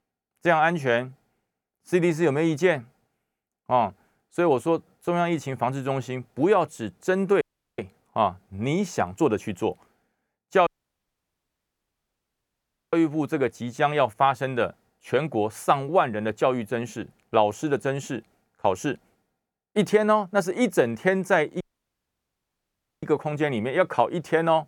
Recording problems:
audio cutting out; at 7.5 s, at 11 s for 2.5 s and at 22 s for 1.5 s

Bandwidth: 18.5 kHz